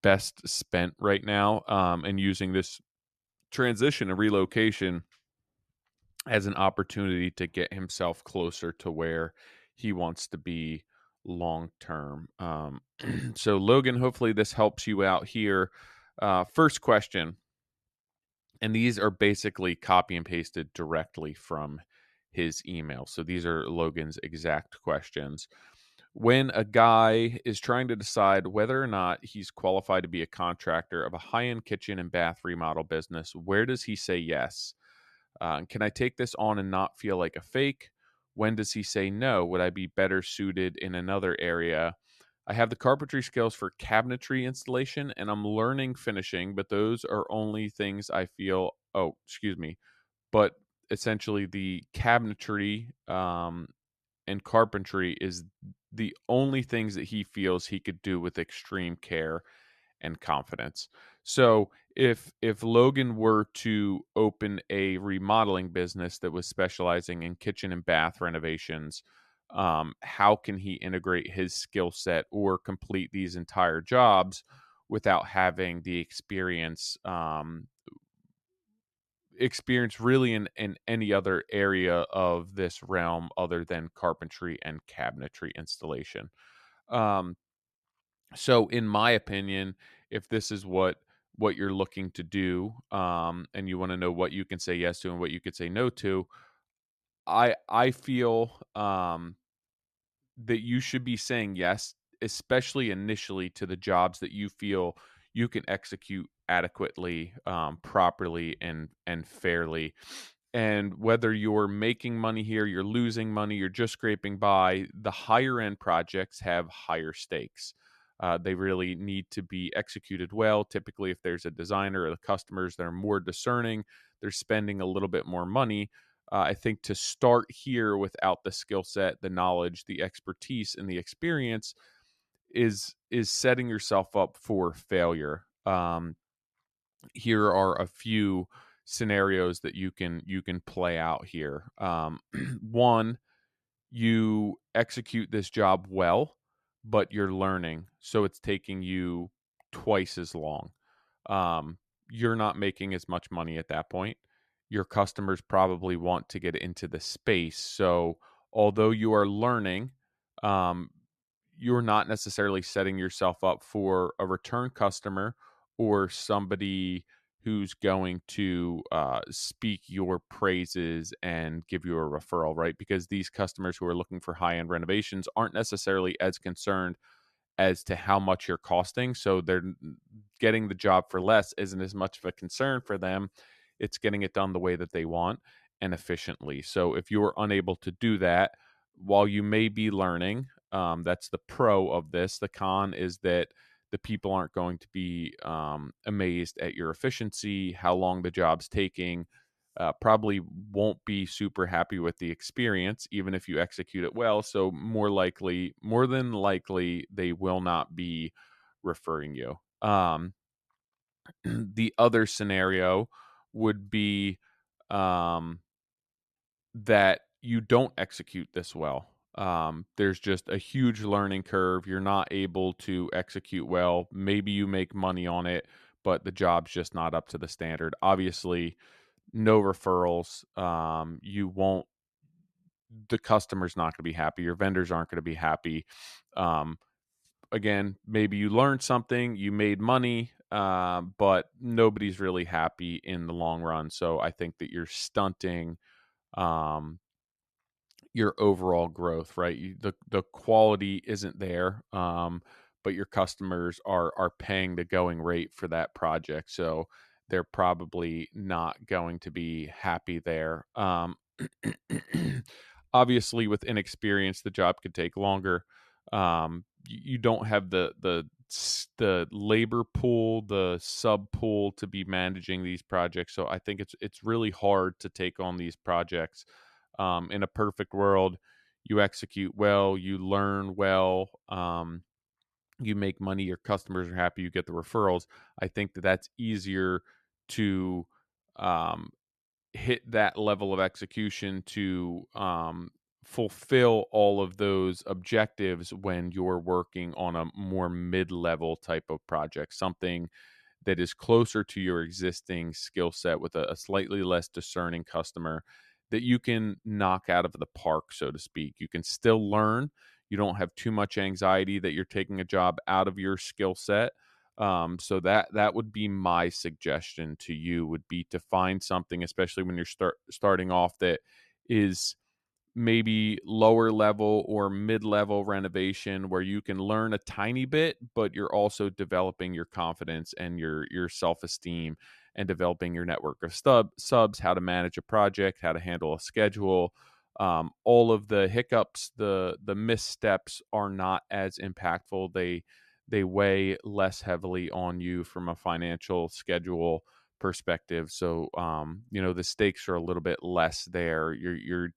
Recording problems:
none

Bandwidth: 13.5 kHz